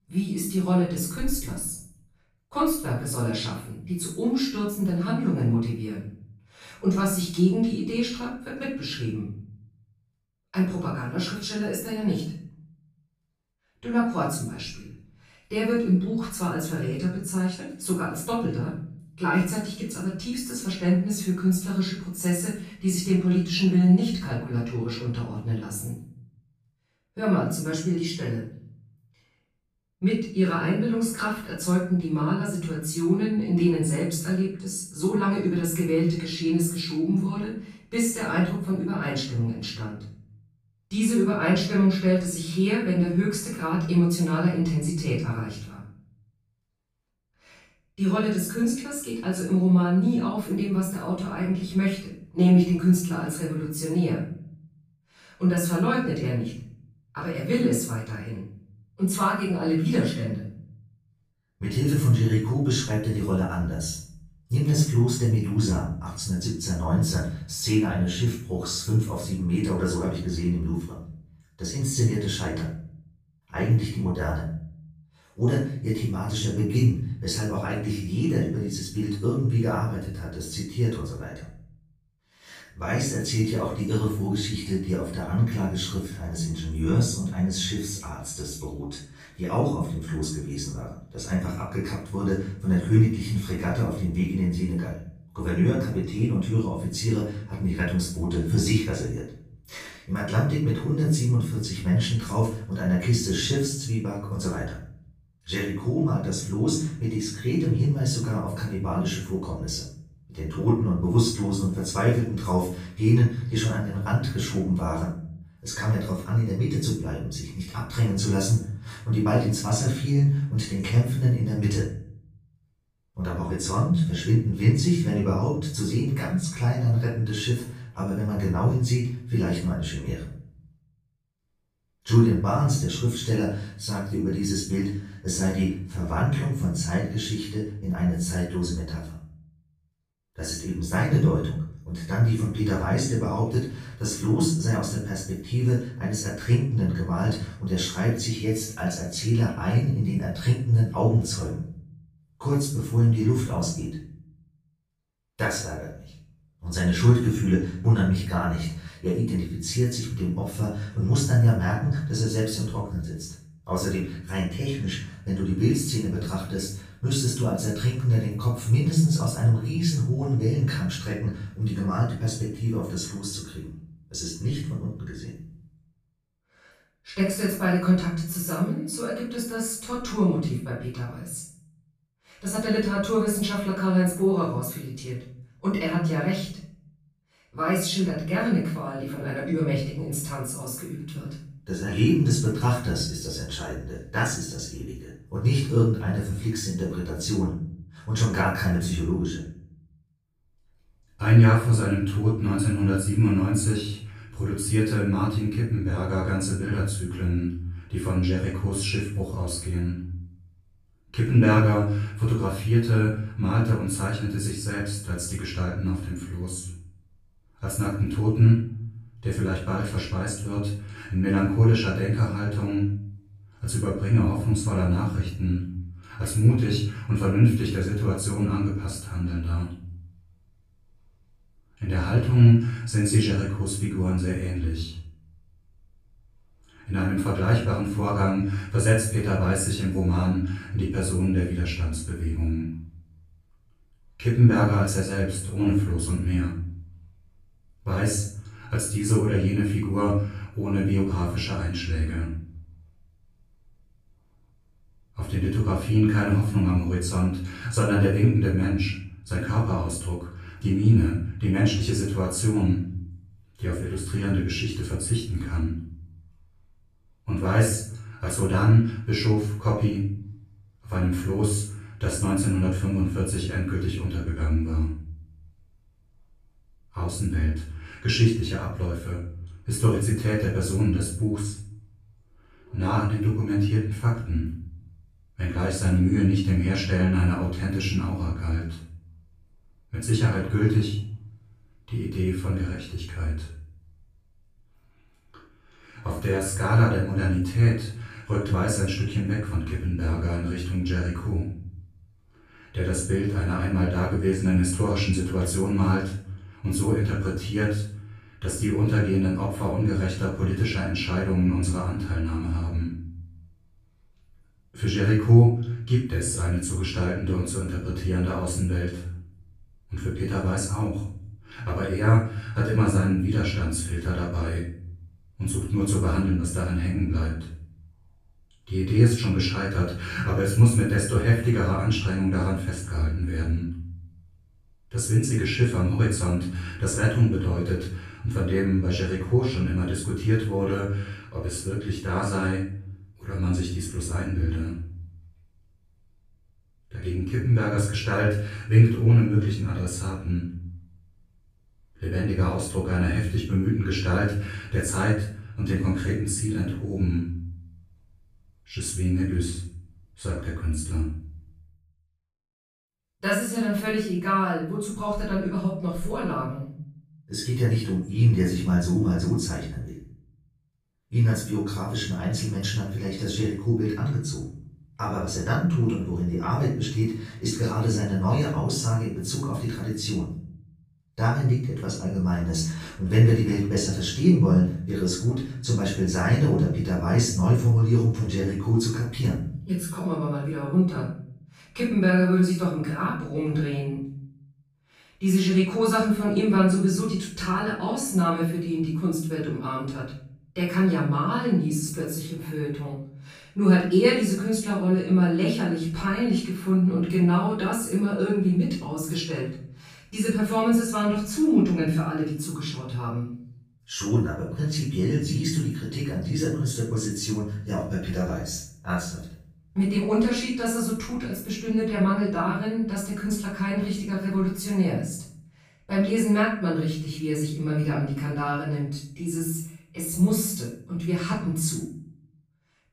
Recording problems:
off-mic speech; far
room echo; noticeable; dies away in 0.6 s

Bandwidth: 15 kHz